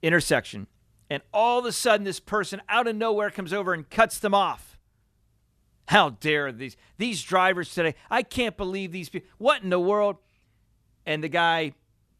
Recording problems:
none

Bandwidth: 13.5 kHz